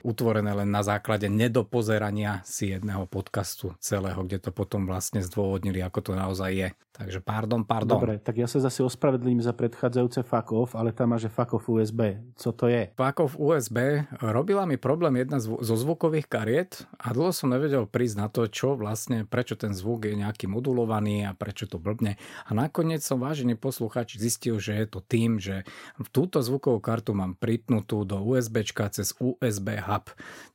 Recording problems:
none

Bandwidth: 16 kHz